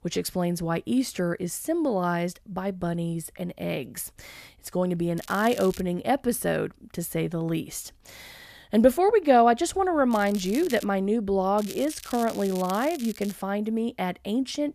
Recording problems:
crackling; noticeable; at 5 s, at 10 s and from 12 to 13 s; 15 dB below the speech

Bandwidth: 14.5 kHz